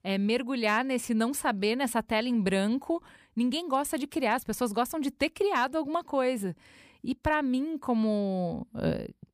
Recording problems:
none

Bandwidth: 15 kHz